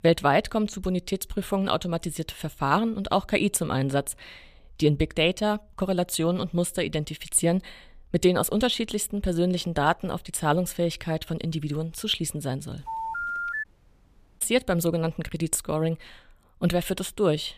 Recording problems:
phone ringing; noticeable; at 13 s; peak 3 dB below the speech
audio cutting out; at 14 s for 1 s

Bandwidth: 14.5 kHz